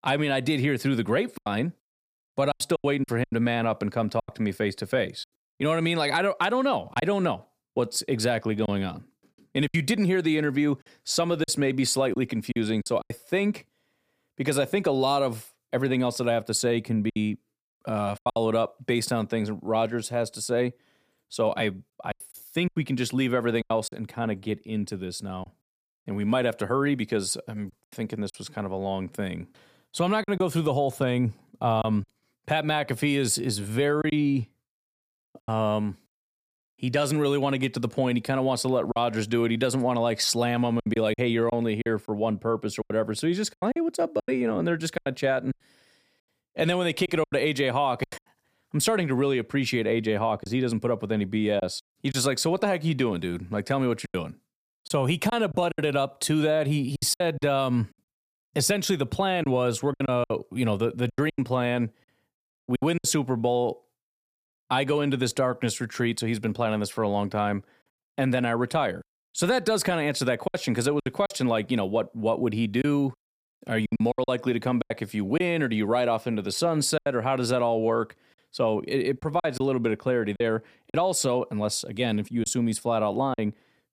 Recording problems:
choppy; very; 6% of the speech affected

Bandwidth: 15 kHz